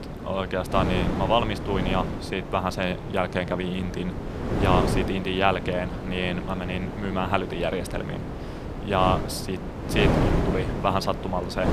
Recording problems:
wind noise on the microphone; heavy; 6 dB below the speech

